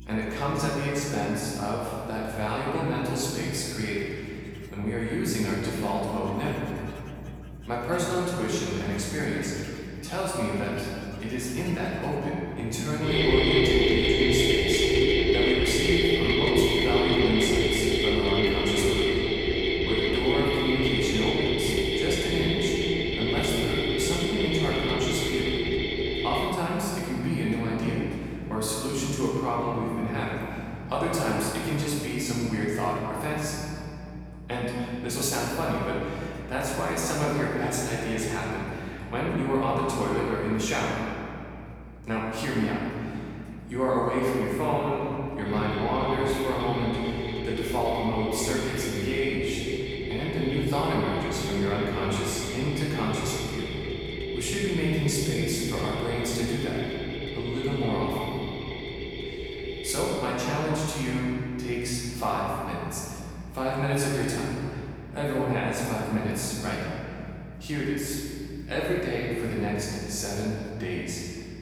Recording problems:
room echo; strong; dies away in 2.7 s
off-mic speech; far
machinery noise; very loud; throughout; 2 dB above the speech
electrical hum; faint; throughout; 60 Hz, 25 dB below the speech

